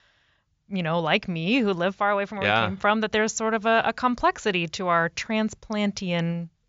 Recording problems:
high frequencies cut off; noticeable; nothing above 7.5 kHz

